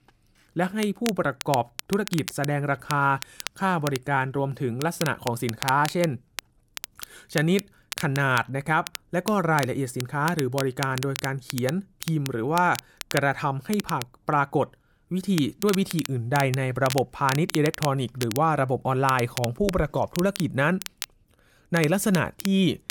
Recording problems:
crackle, like an old record; noticeable; 10 dB below the speech

